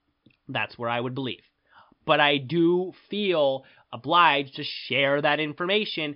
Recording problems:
high frequencies cut off; noticeable; nothing above 5.5 kHz

